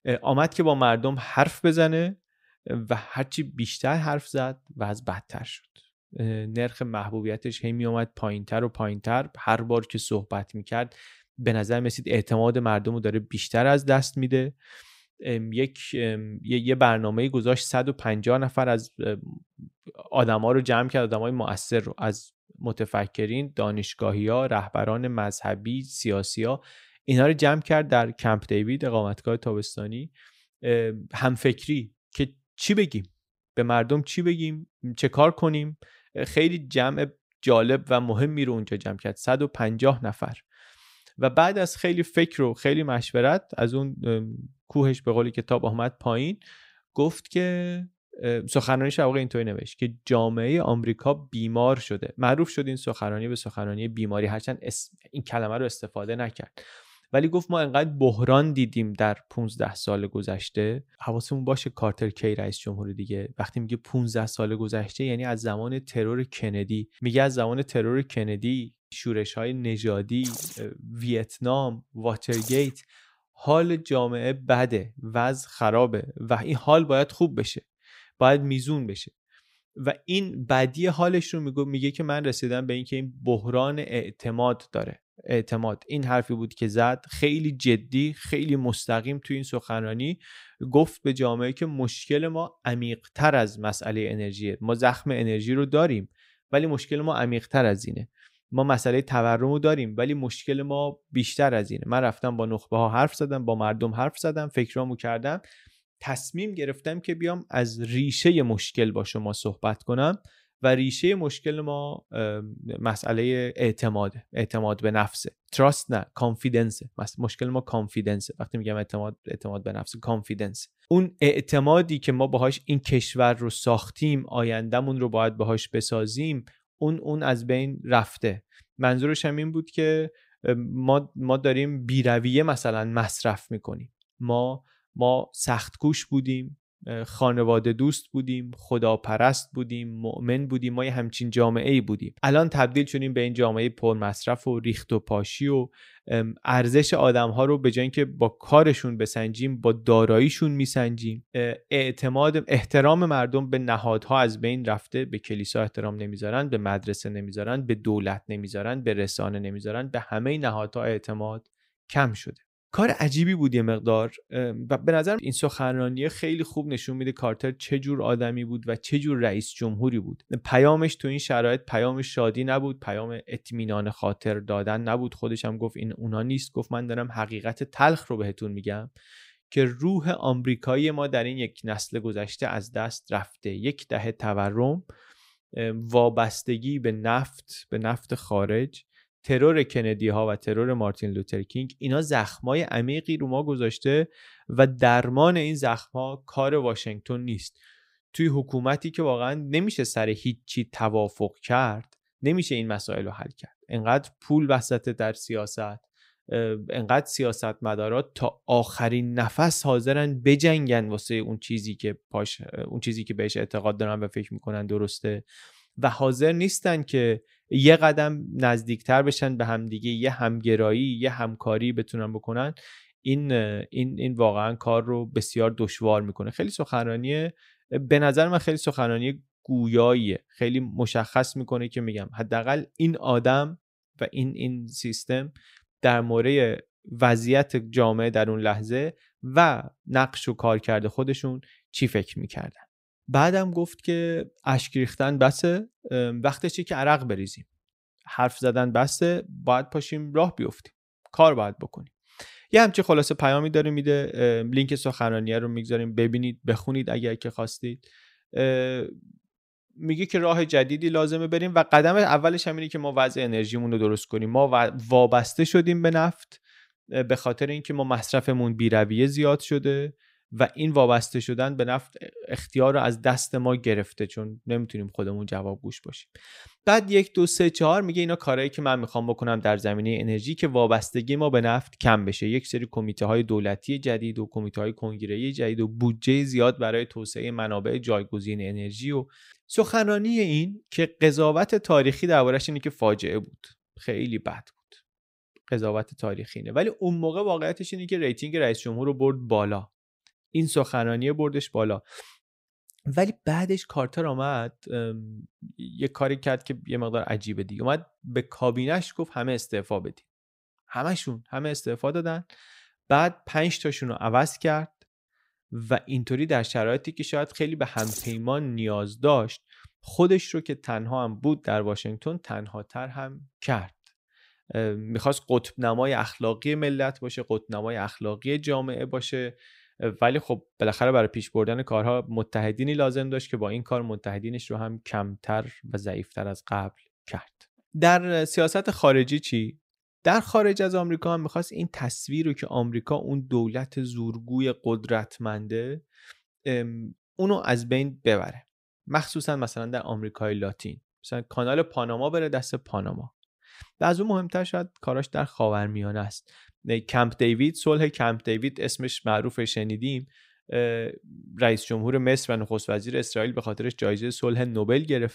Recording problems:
none

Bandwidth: 15.5 kHz